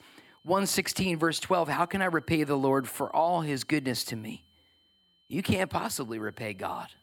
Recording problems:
high-pitched whine; faint; throughout; 3 kHz, 35 dB below the speech

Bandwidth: 17 kHz